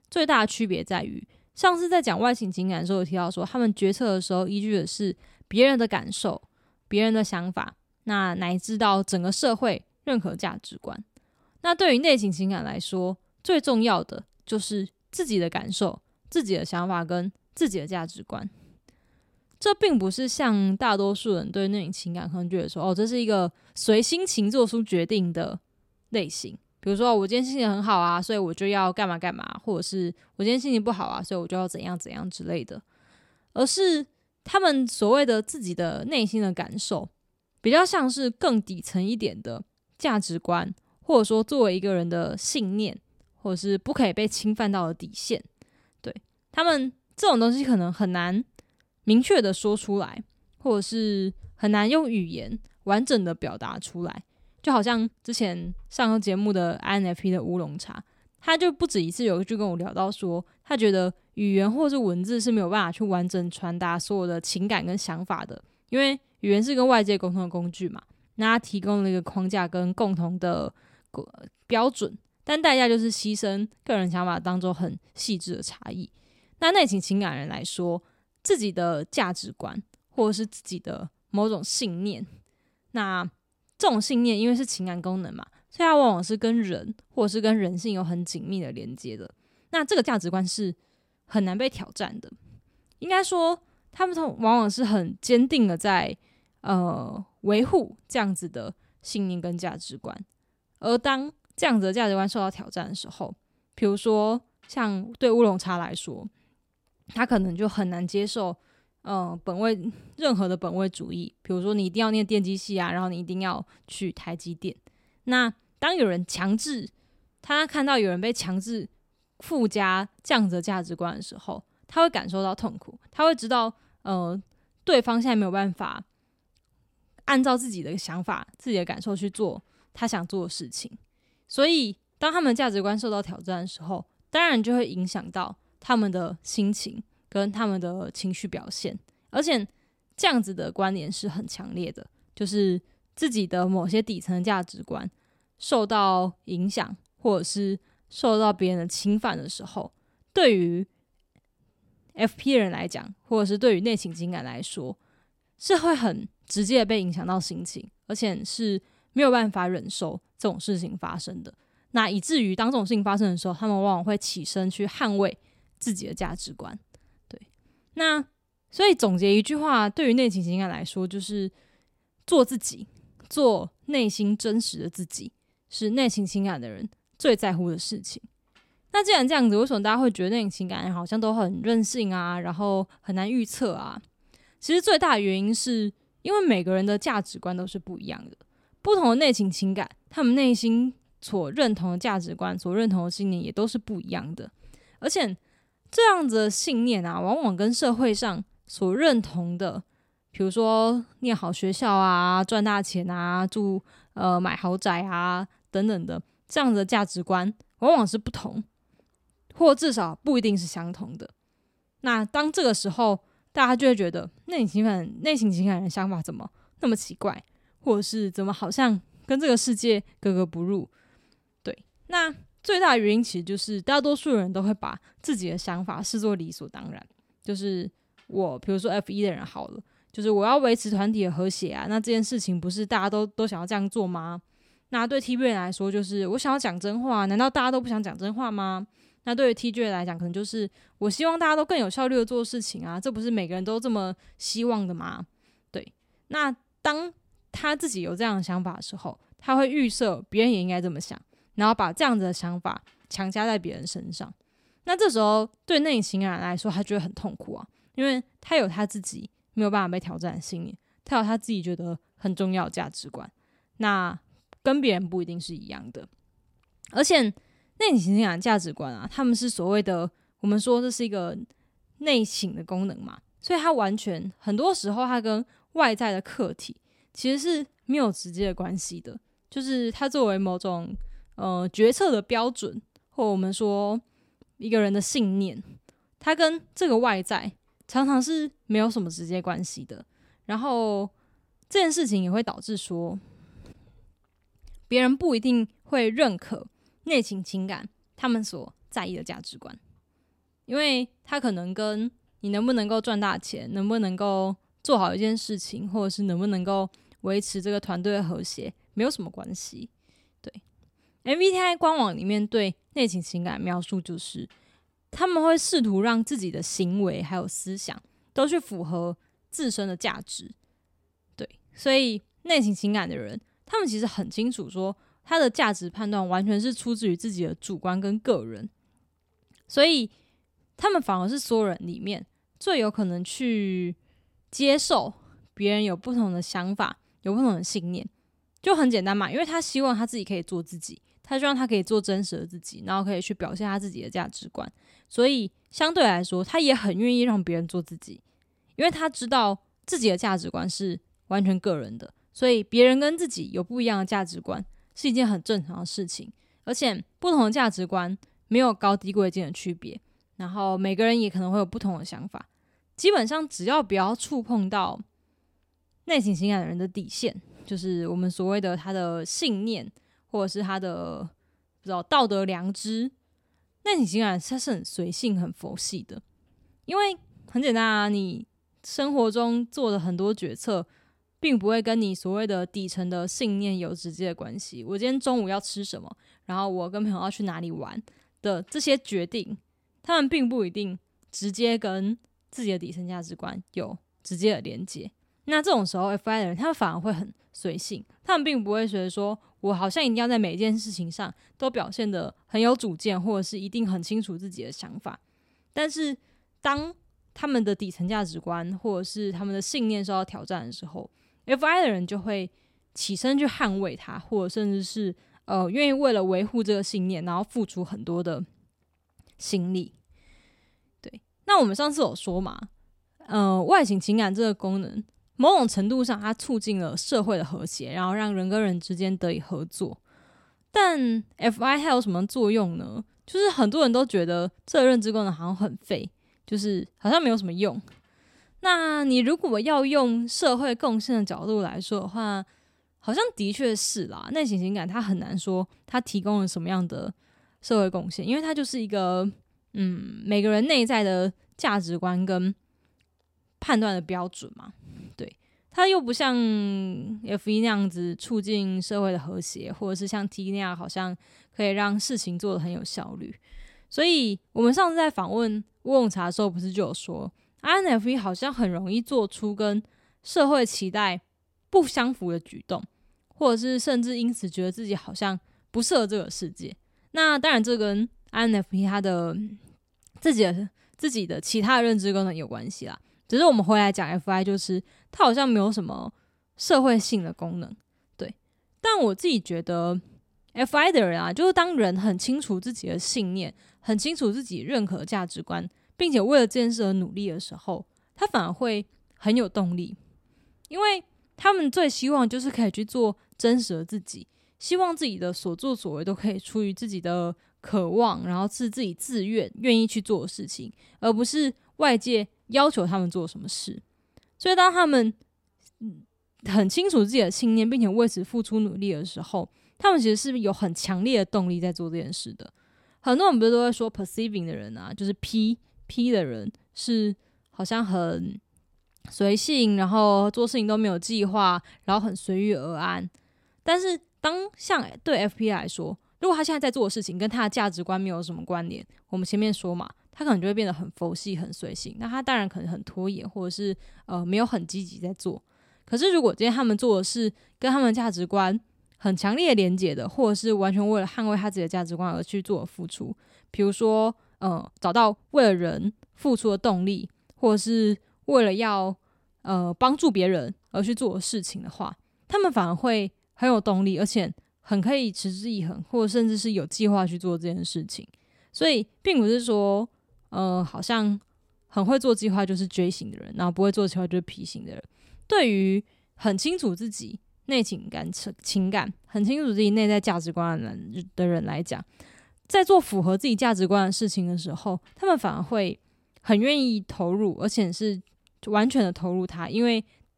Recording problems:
uneven, jittery; strongly; from 55 s to 9:20

